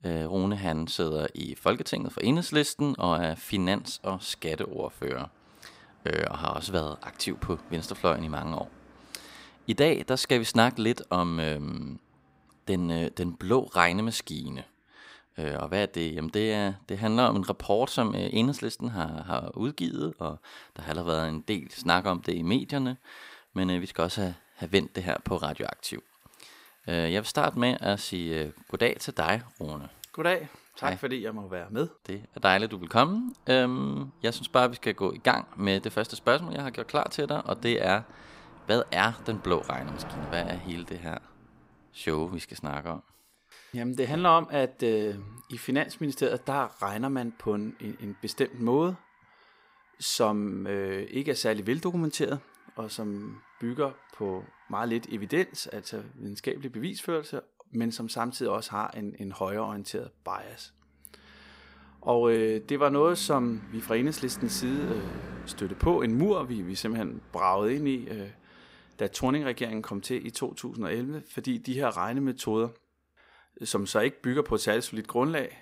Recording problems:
traffic noise; faint; throughout; 20 dB below the speech

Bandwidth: 15.5 kHz